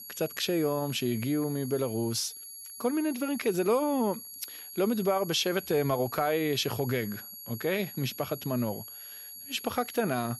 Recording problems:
high-pitched whine; noticeable; throughout; 11.5 kHz, 10 dB below the speech

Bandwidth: 14 kHz